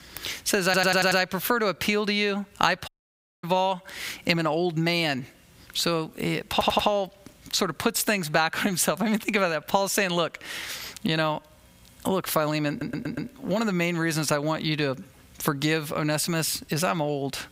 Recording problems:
squashed, flat; heavily
audio stuttering; at 0.5 s, at 6.5 s and at 13 s
audio cutting out; at 3 s for 0.5 s

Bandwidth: 15.5 kHz